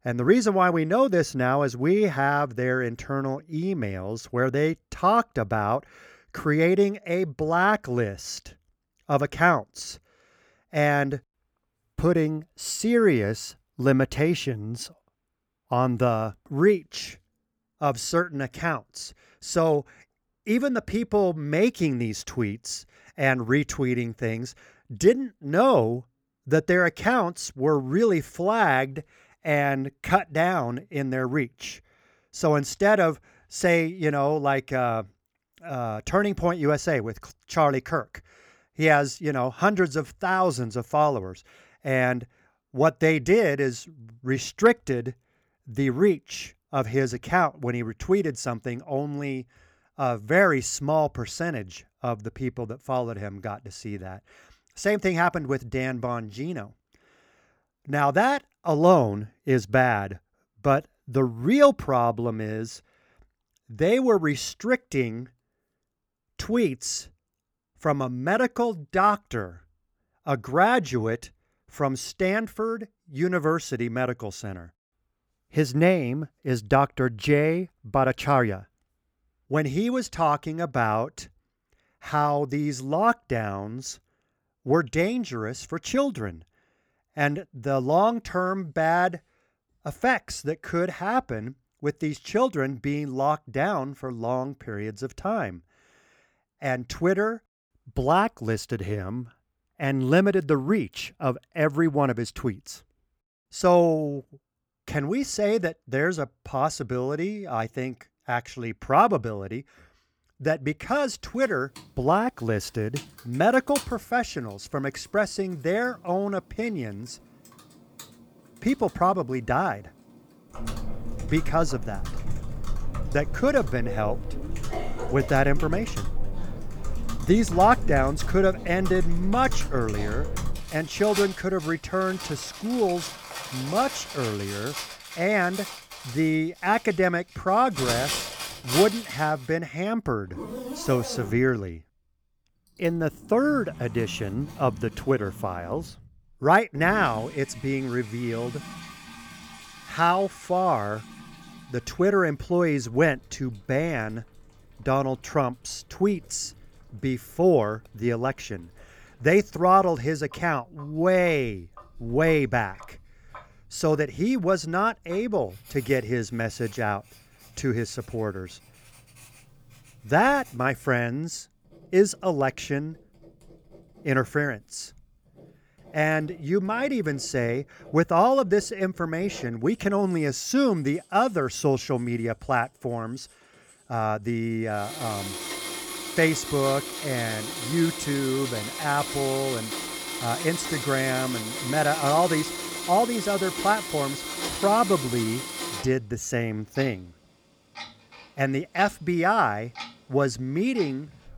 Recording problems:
household noises; loud; from 1:51 on; 9 dB below the speech

